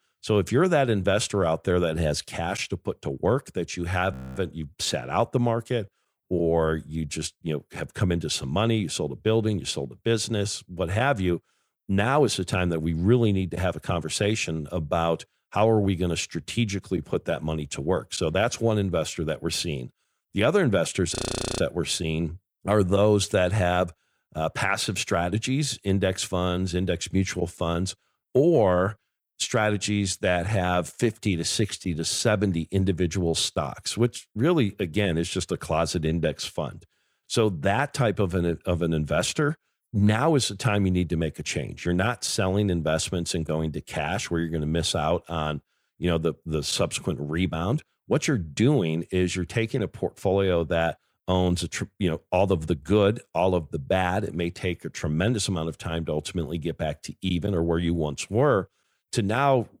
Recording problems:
audio freezing; at 4 s and at 21 s

